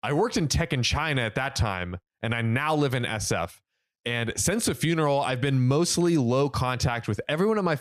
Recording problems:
squashed, flat; somewhat

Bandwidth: 15 kHz